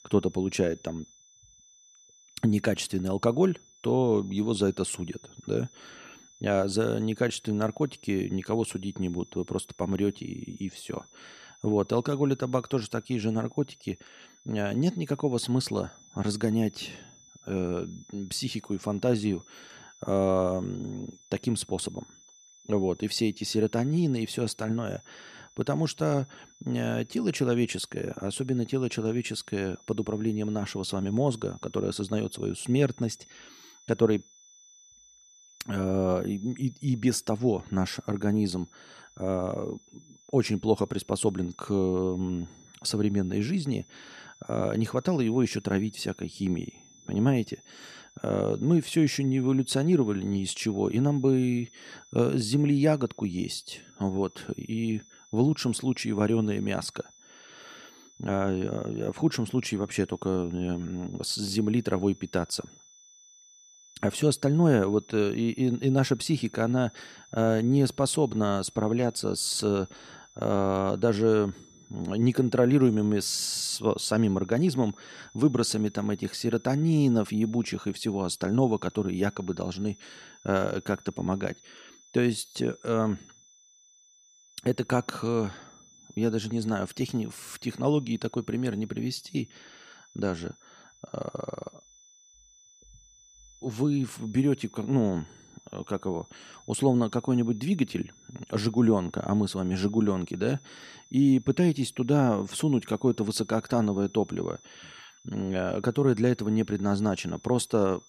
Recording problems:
high-pitched whine; faint; throughout; 6 kHz, 25 dB below the speech

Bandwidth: 14.5 kHz